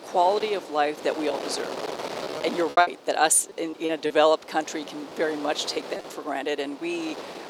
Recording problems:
thin; very slightly; fading below 450 Hz
wind noise on the microphone; occasional gusts; 10 dB below the speech
choppy; occasionally; 5% of the speech affected

